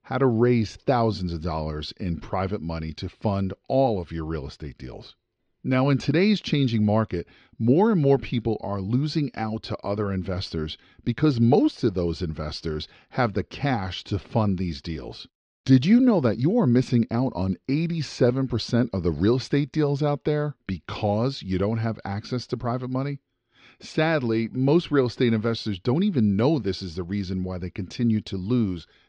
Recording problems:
muffled; slightly; fading above 4.5 kHz

